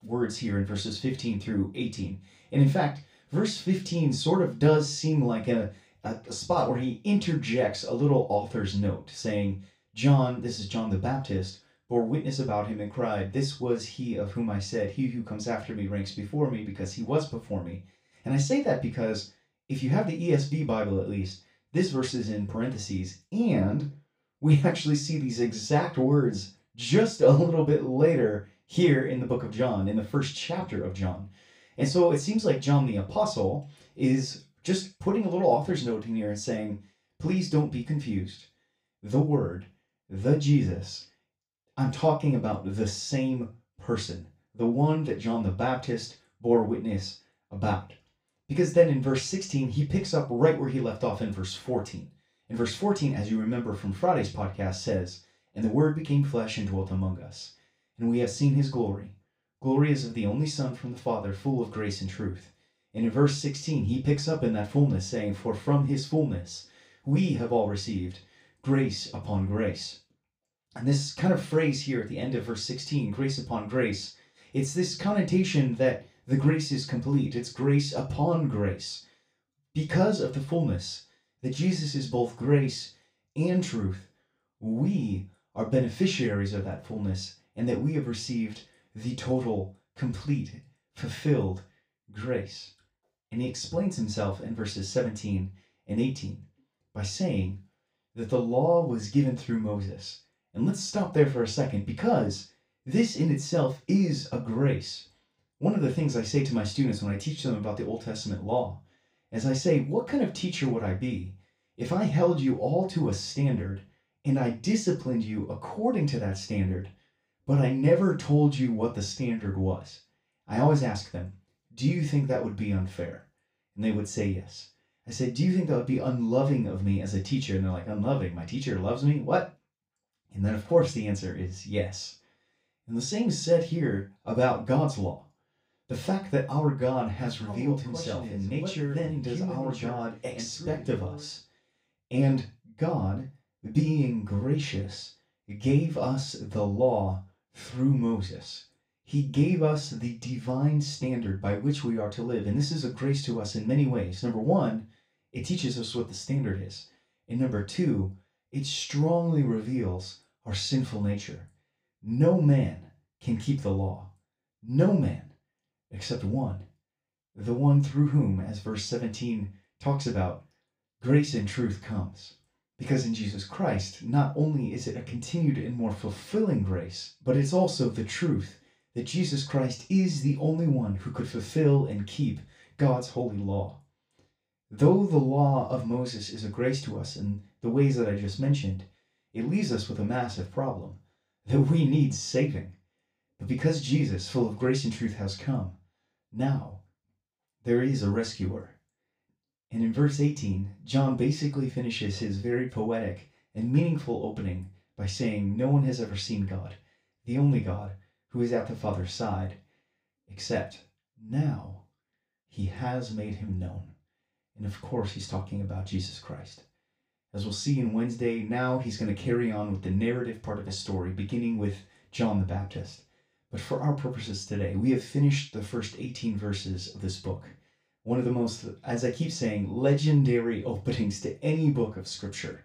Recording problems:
off-mic speech; far
room echo; slight; dies away in 0.2 s

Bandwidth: 15.5 kHz